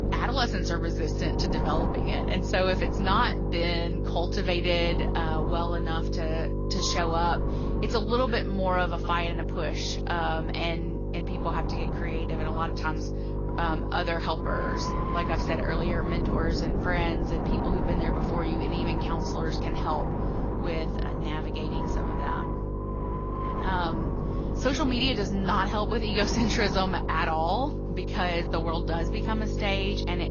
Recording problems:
garbled, watery; slightly; nothing above 6.5 kHz
wind noise on the microphone; heavy; 7 dB below the speech
electrical hum; loud; throughout; 50 Hz, 9 dB below the speech

